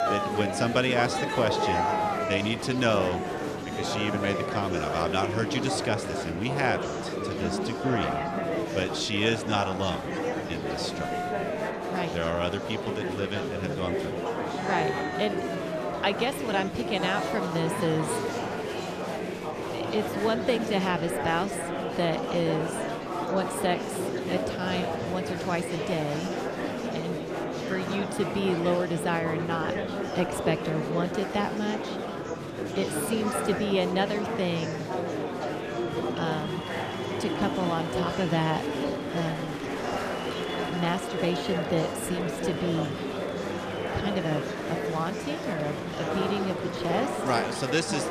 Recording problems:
murmuring crowd; loud; throughout; 1 dB below the speech

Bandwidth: 14 kHz